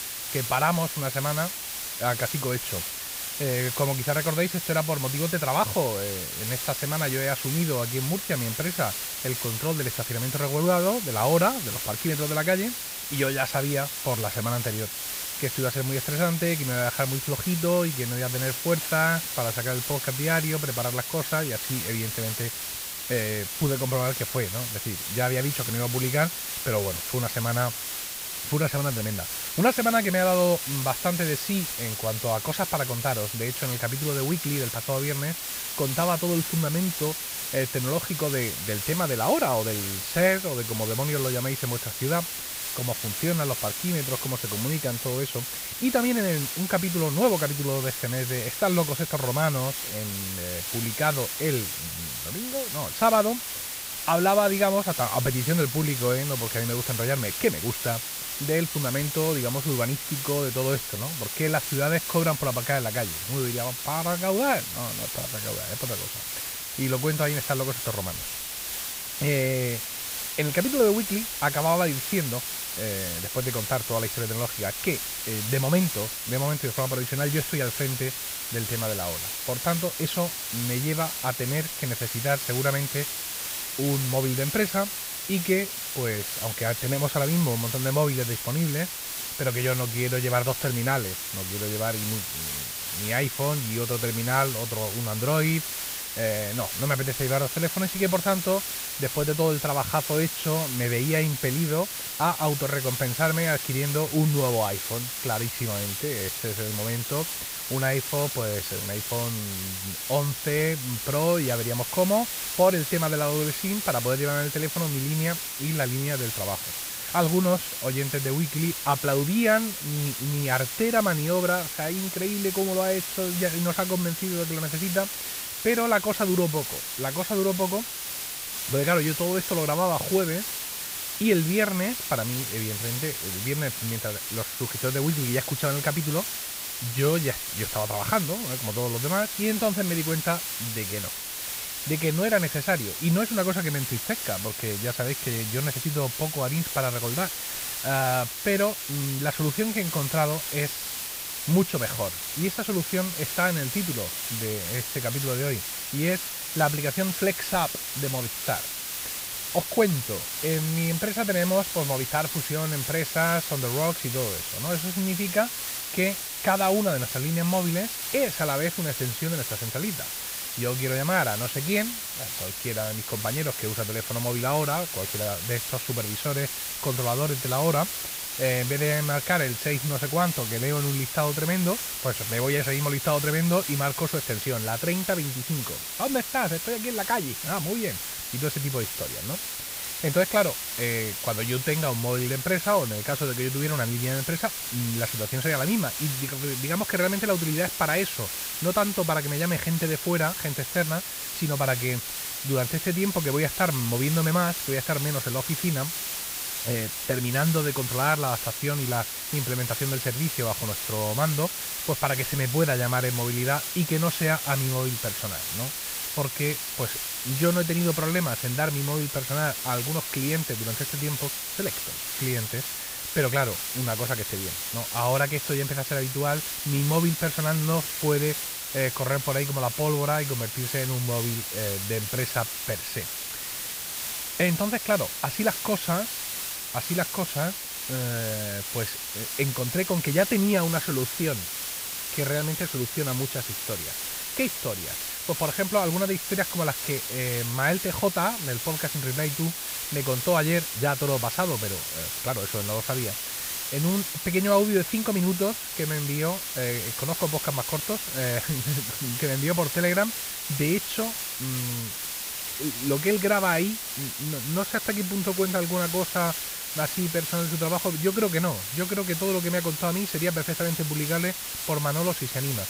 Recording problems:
muffled; slightly; fading above 3 kHz
hiss; loud; throughout; 3 dB below the speech

